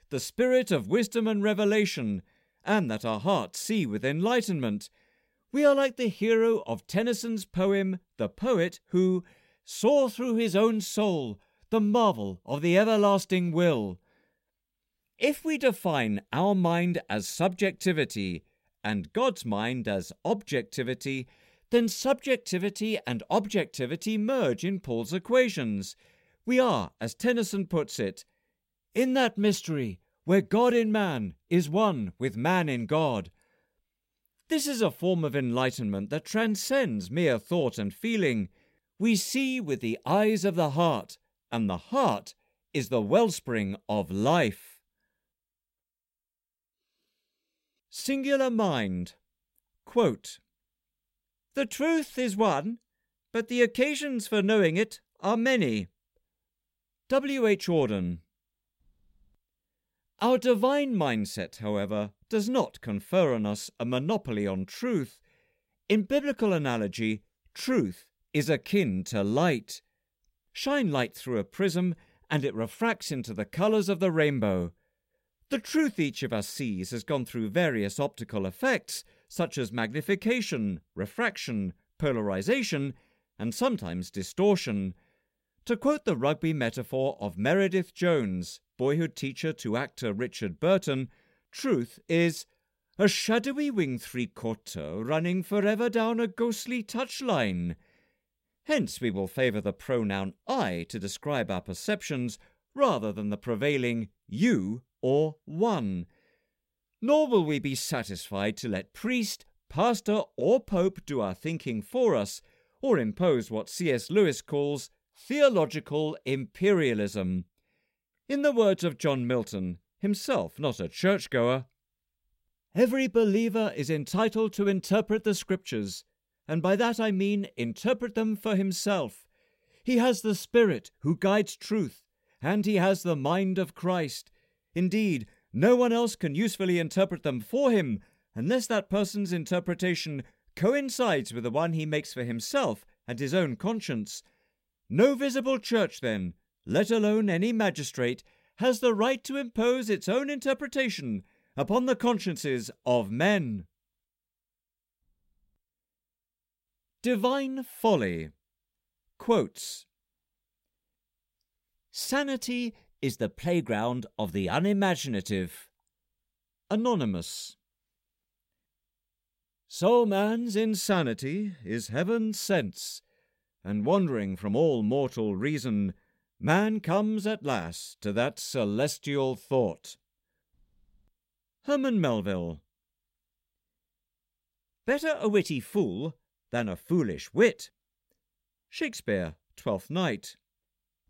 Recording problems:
none

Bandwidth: 16 kHz